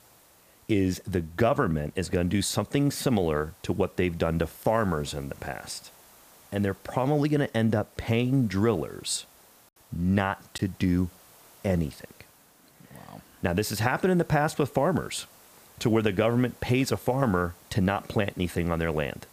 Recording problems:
hiss; faint; throughout; 25 dB below the speech
choppy; occasionally; at 11 s; 2% of the speech affected

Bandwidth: 15 kHz